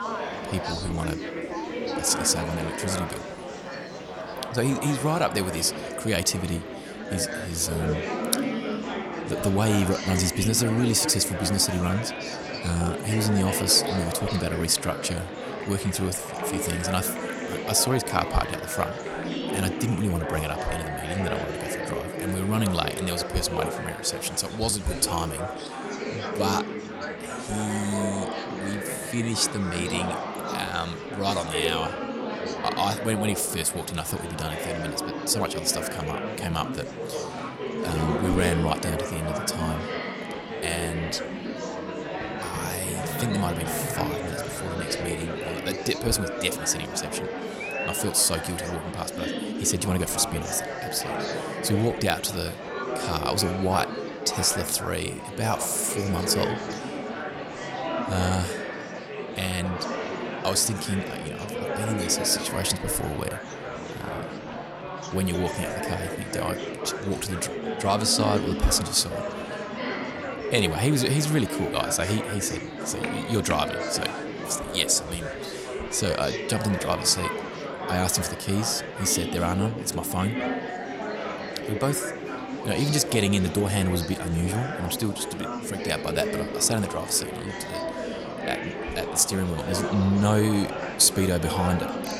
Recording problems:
murmuring crowd; loud; throughout; 5 dB below the speech
background music; faint; throughout; 25 dB below the speech

